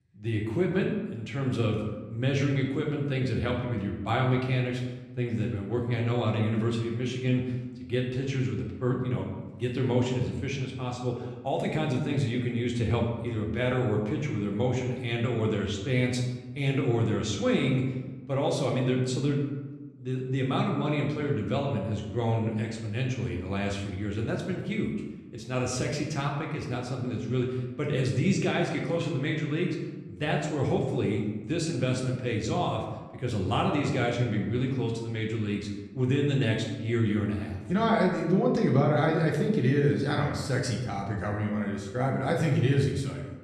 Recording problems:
room echo; noticeable; dies away in 1 s
off-mic speech; somewhat distant

